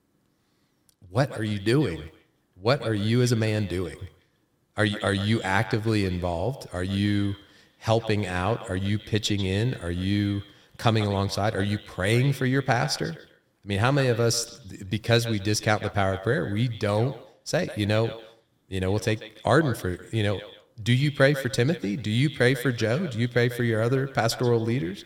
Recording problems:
echo of what is said; noticeable; throughout; 140 ms later, 15 dB below the speech

